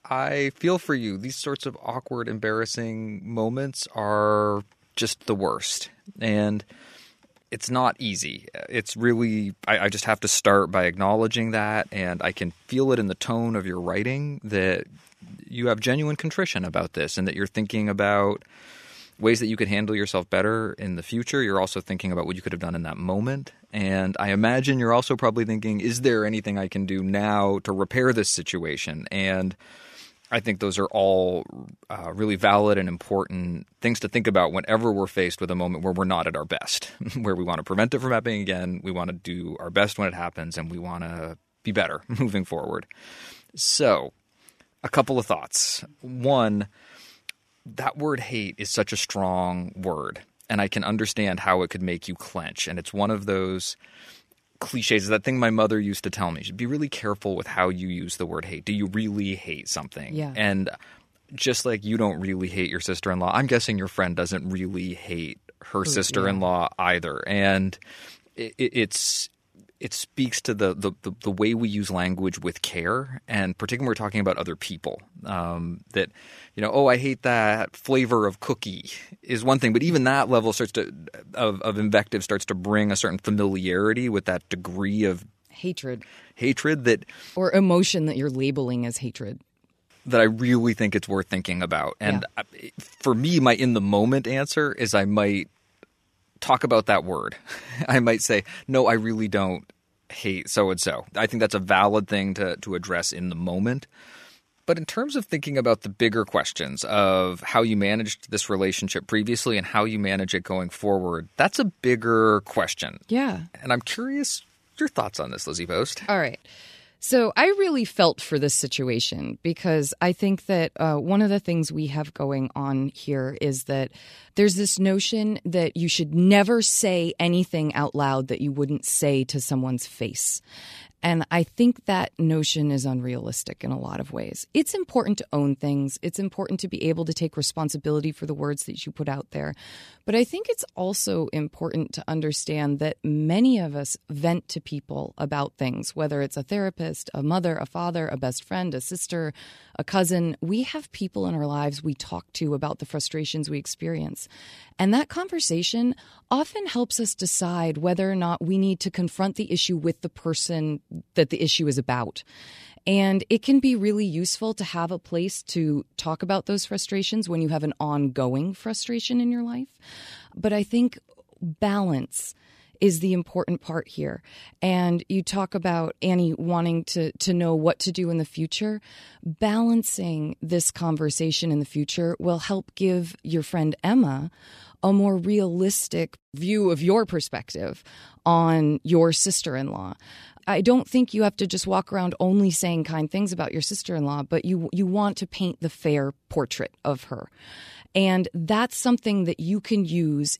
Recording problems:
none

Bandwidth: 14.5 kHz